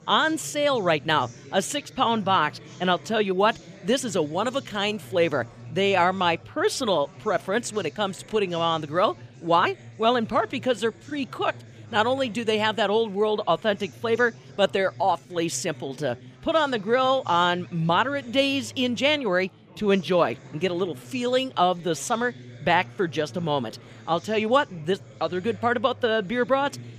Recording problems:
chatter from many people; faint; throughout; 20 dB below the speech

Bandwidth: 15 kHz